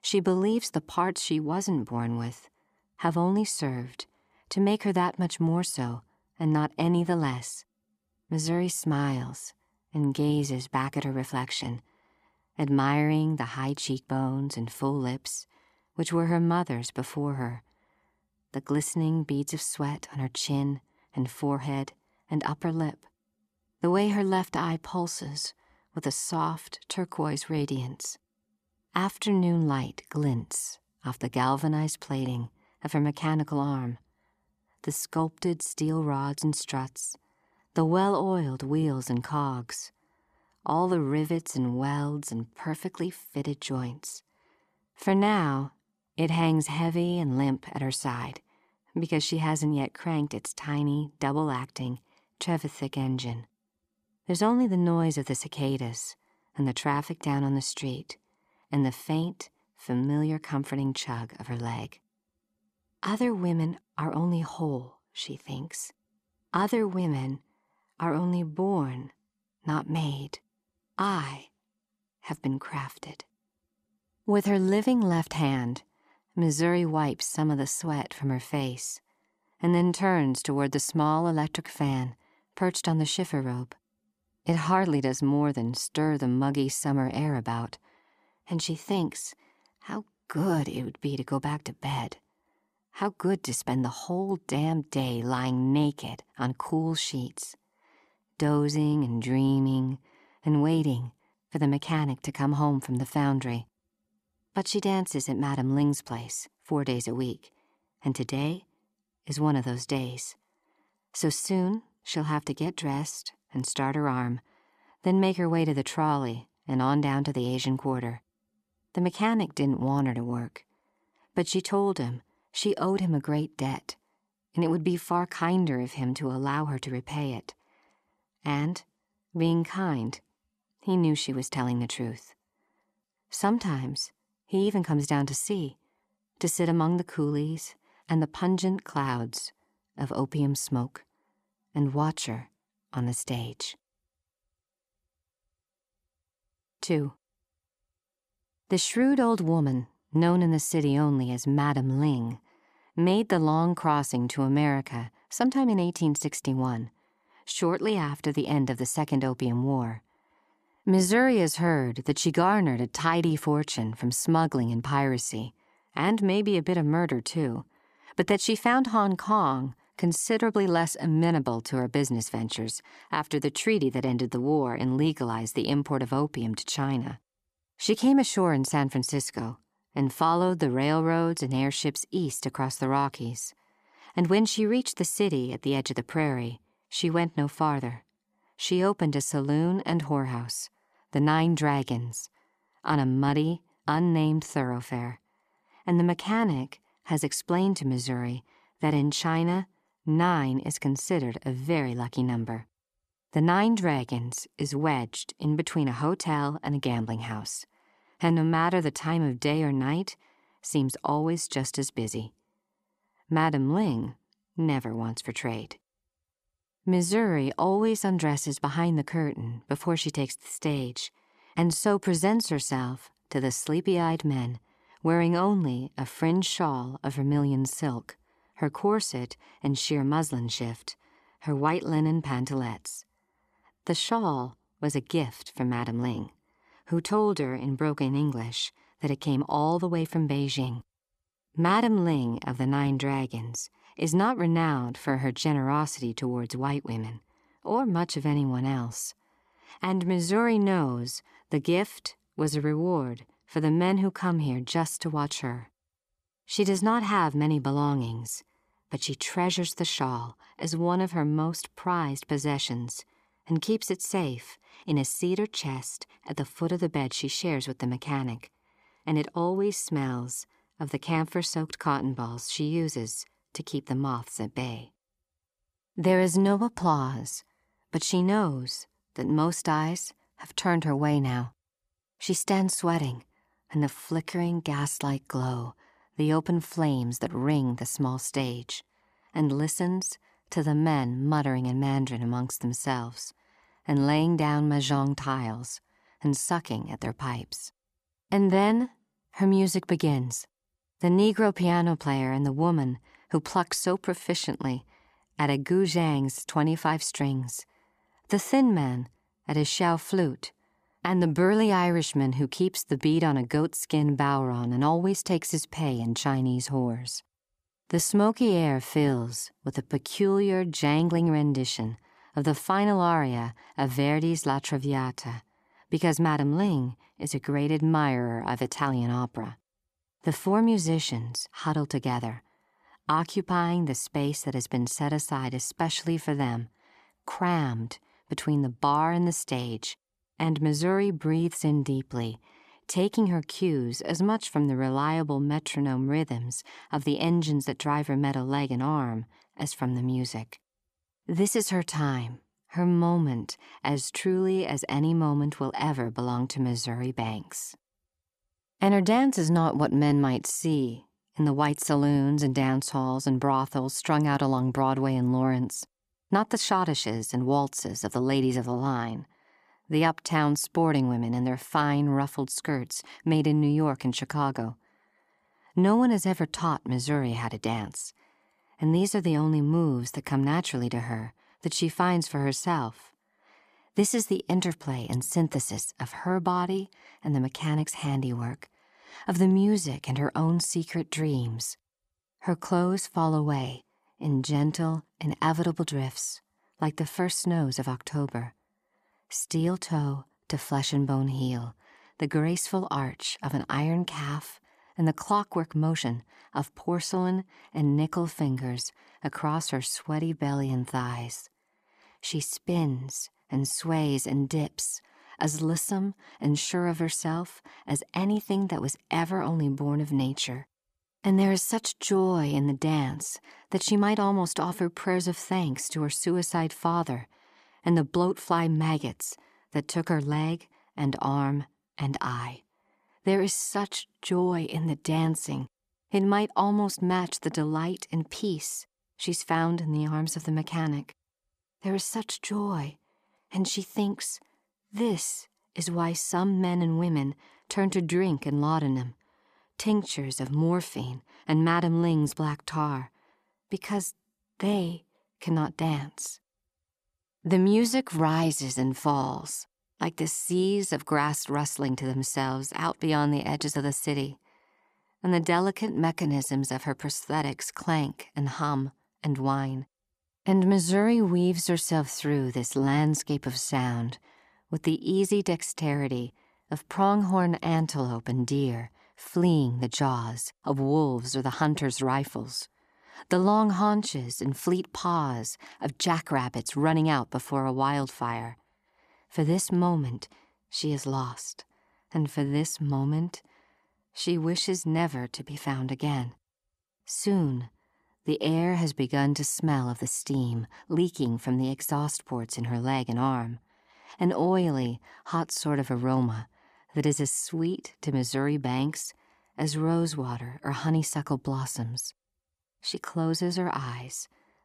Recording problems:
none

